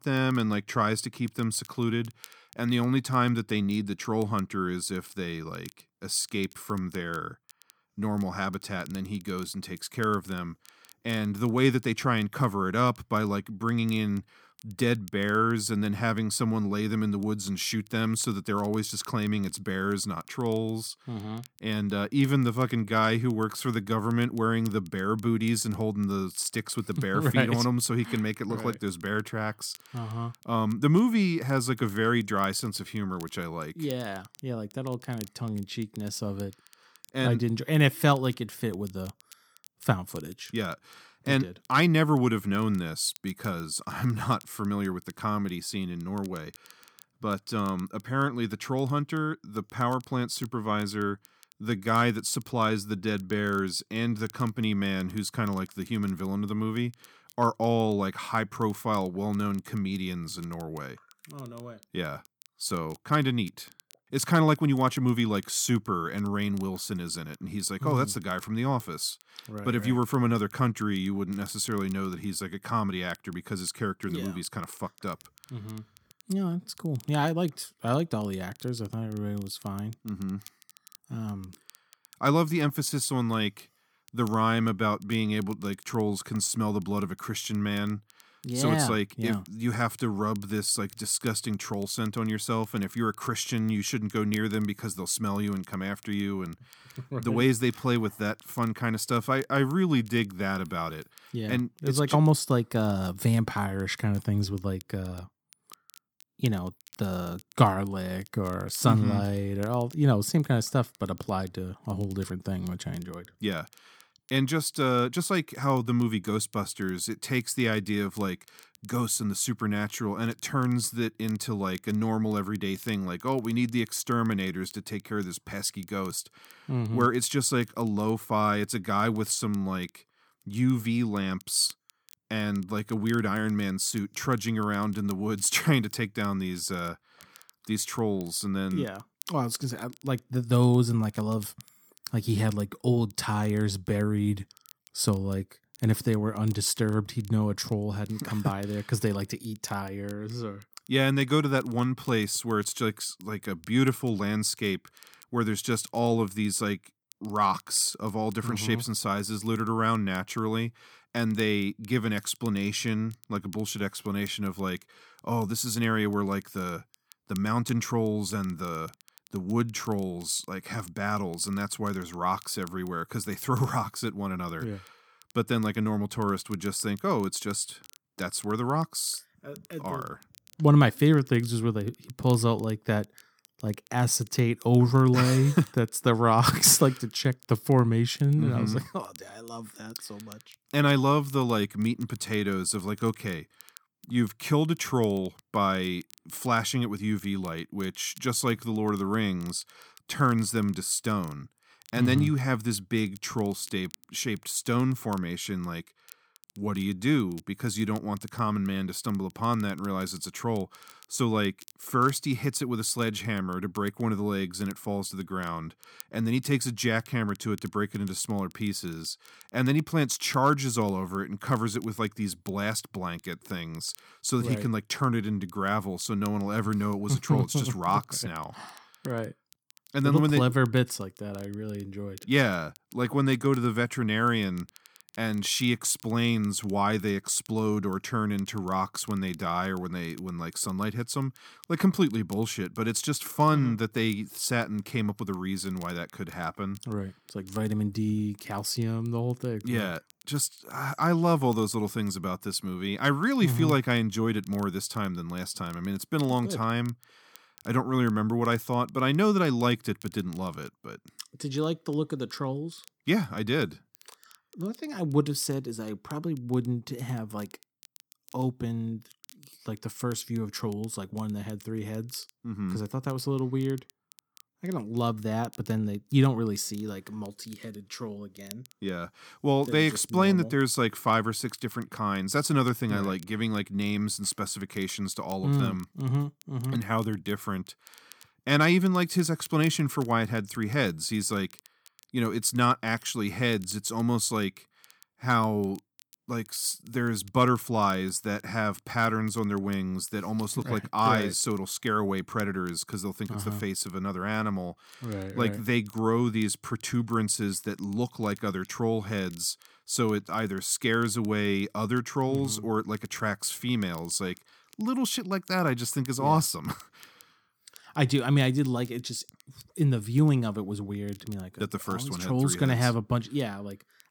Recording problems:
crackle, like an old record; faint; 25 dB below the speech

